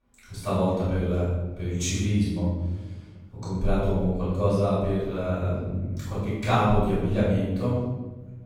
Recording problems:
room echo; strong; dies away in 1.4 s
off-mic speech; far

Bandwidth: 17.5 kHz